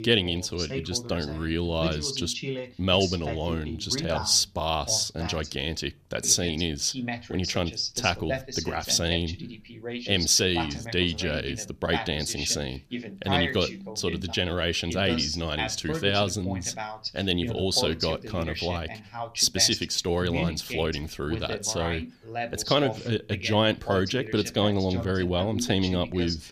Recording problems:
voice in the background; loud; throughout; 8 dB below the speech

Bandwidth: 14.5 kHz